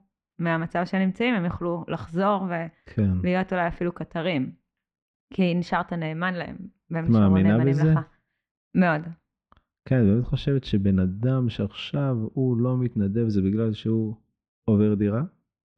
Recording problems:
muffled; slightly; fading above 2.5 kHz

